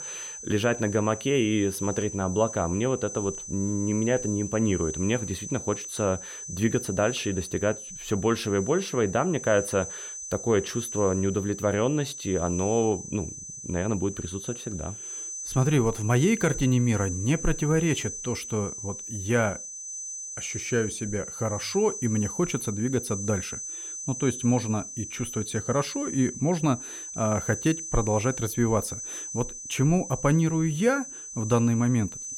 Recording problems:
high-pitched whine; loud; throughout; 6 kHz, 8 dB below the speech

